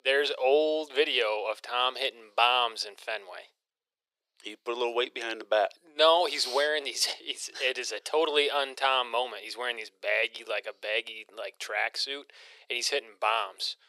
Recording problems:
thin; very; fading below 400 Hz

